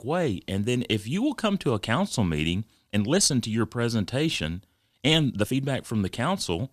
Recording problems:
uneven, jittery; strongly; from 3 to 5.5 s

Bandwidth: 14.5 kHz